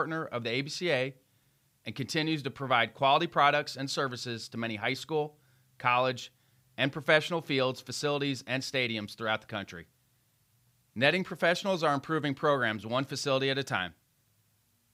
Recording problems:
abrupt cut into speech; at the start

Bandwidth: 15.5 kHz